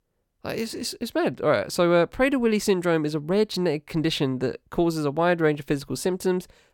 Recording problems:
none

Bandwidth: 17 kHz